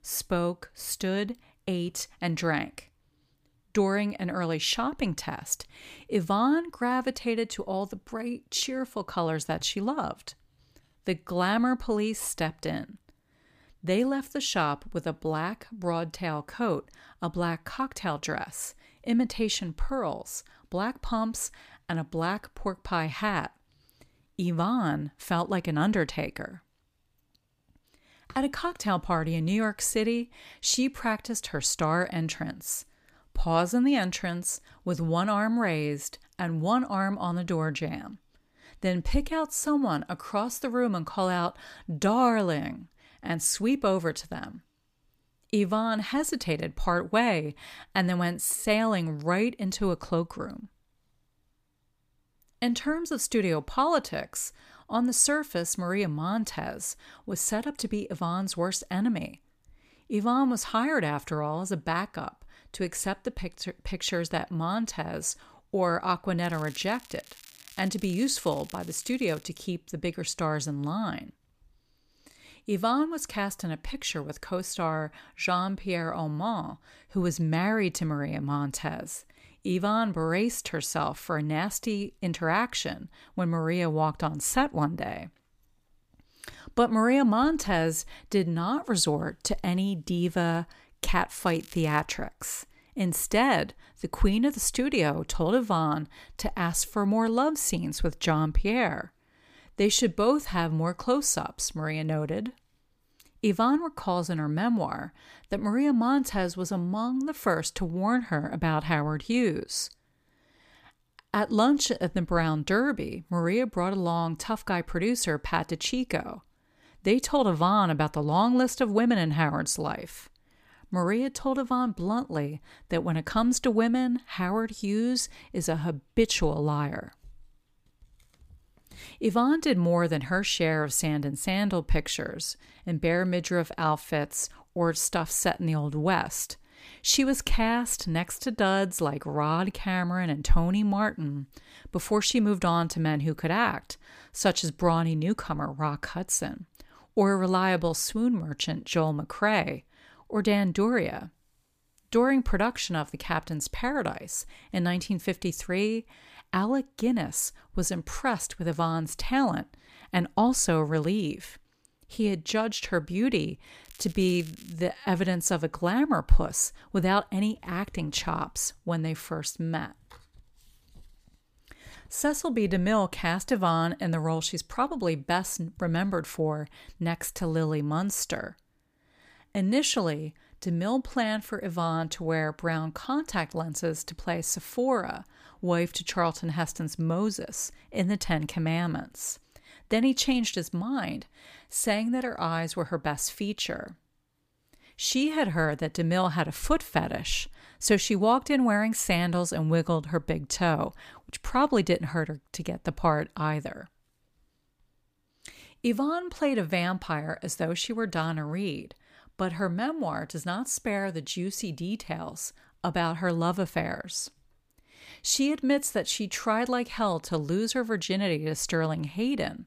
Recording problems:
crackling; faint; from 1:06 to 1:09, at 1:31 and at 2:44; 20 dB below the speech

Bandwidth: 15 kHz